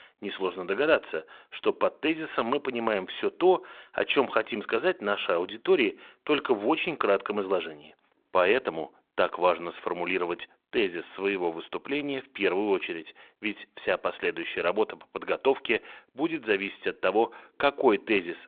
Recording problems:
phone-call audio

